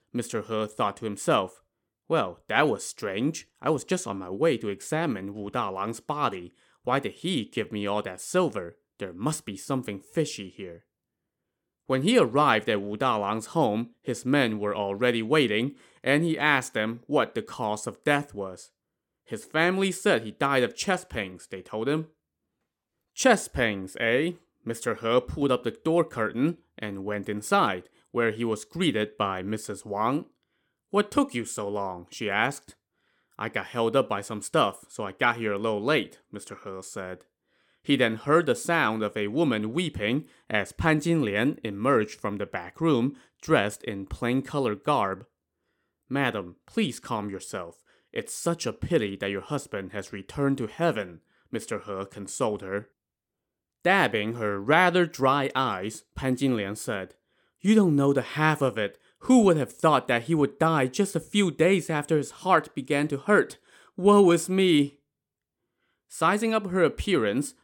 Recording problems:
none

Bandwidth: 17.5 kHz